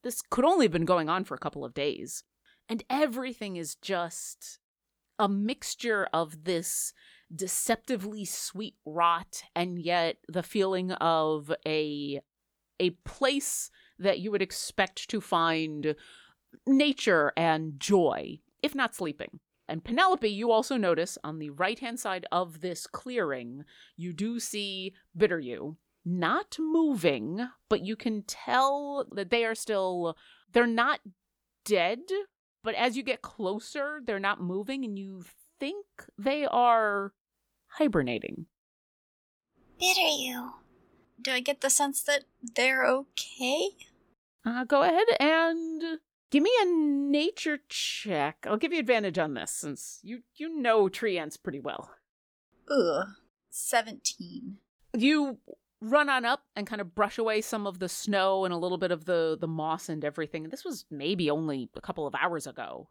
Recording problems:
none

